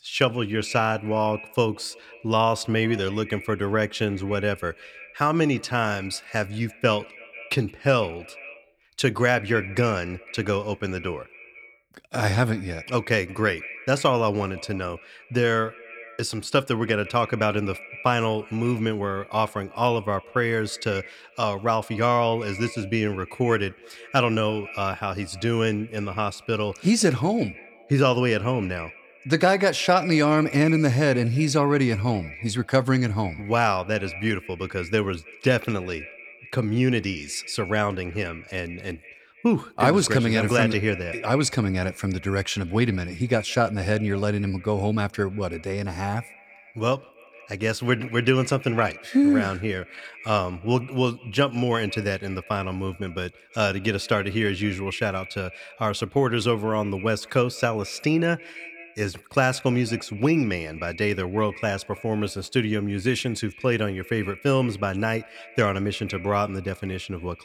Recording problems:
echo of what is said; noticeable; throughout; 160 ms later, 15 dB below the speech

